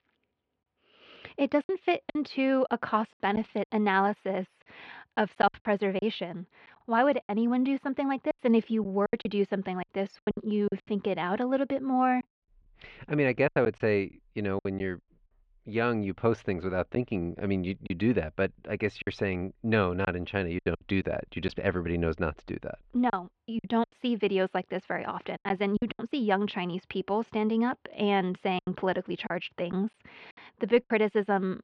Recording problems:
muffled; slightly; fading above 3 kHz
choppy; very; 7% of the speech affected

